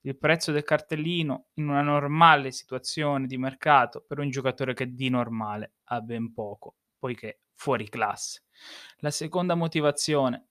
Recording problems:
none

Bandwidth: 14.5 kHz